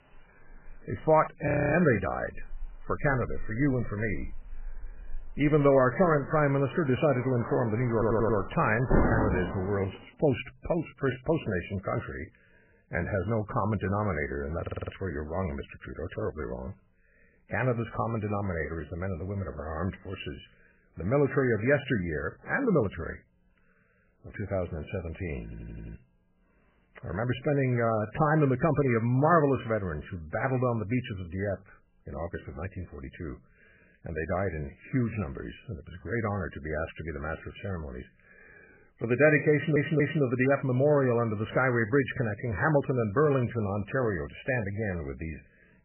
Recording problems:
garbled, watery; badly; nothing above 3 kHz
rain or running water; loud; until 10 s; 8 dB below the speech
audio freezing; at 1.5 s
audio stuttering; 4 times, first at 8 s

